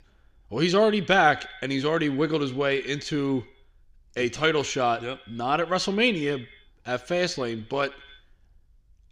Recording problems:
echo of what is said; faint; throughout; 80 ms later, 20 dB below the speech

